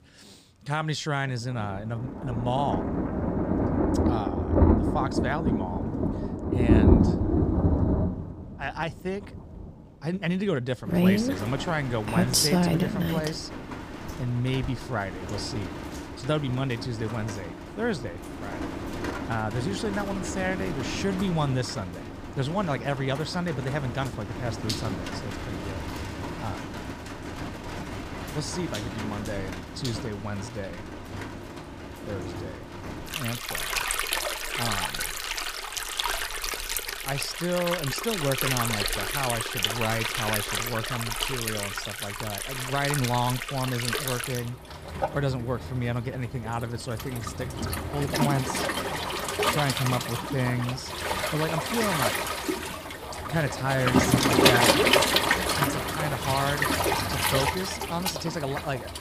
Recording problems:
rain or running water; very loud; throughout; 3 dB above the speech

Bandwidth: 15 kHz